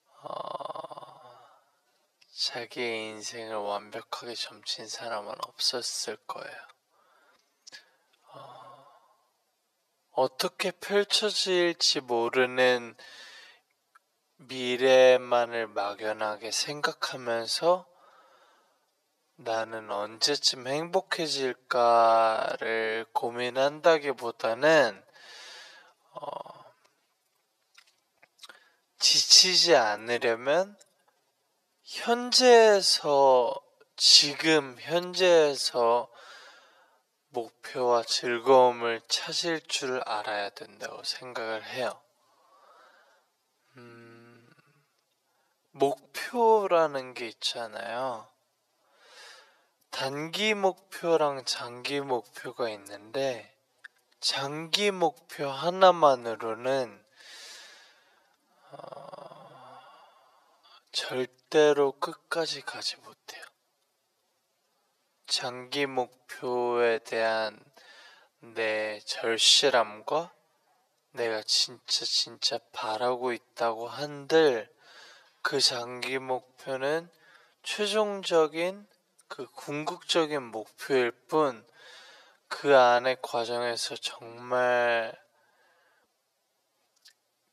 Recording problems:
thin; very; fading below 500 Hz
wrong speed, natural pitch; too slow; 0.6 times normal speed

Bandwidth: 14 kHz